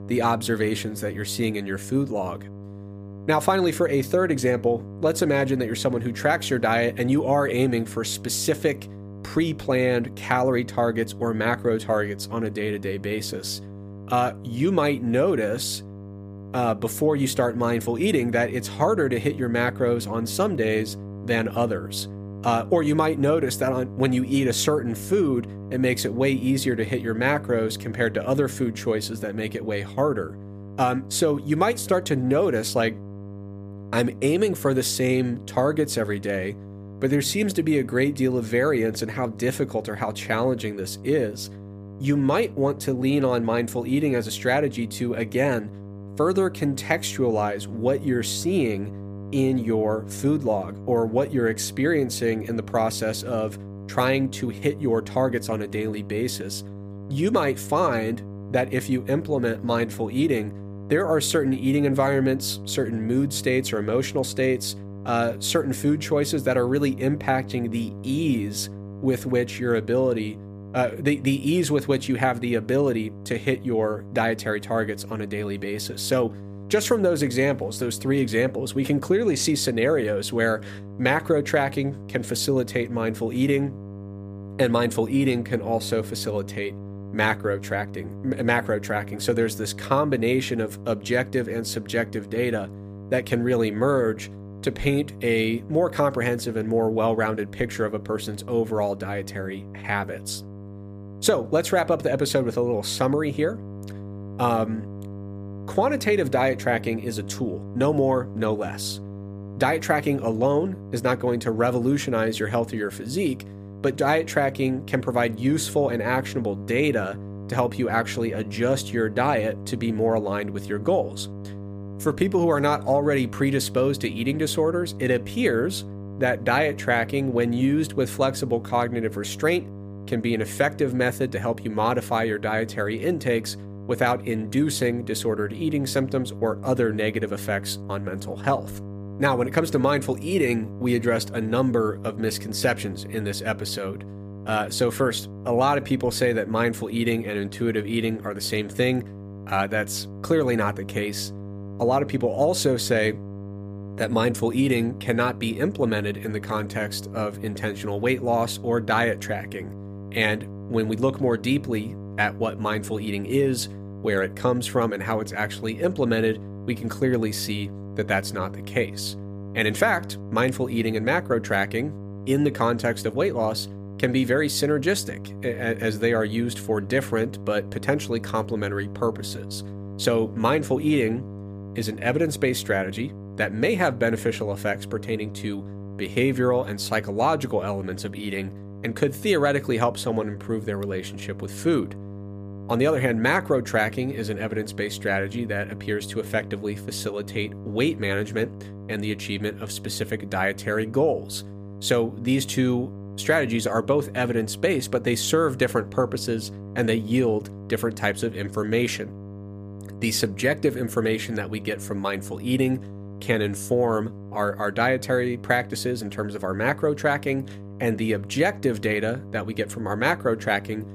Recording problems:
electrical hum; noticeable; throughout; 50 Hz, 20 dB below the speech

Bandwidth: 15 kHz